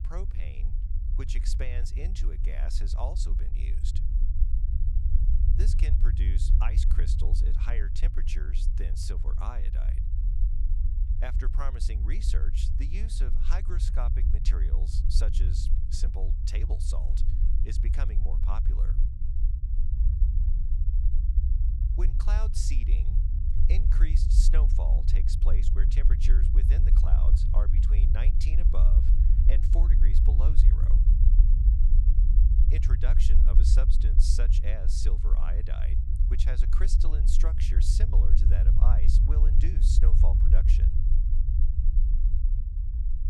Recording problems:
low rumble; loud; throughout; 3 dB below the speech

